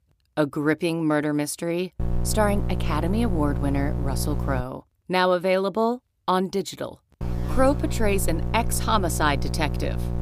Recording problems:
electrical hum; noticeable; from 2 to 4.5 s and from 7 s on; 60 Hz, 15 dB below the speech

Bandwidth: 15 kHz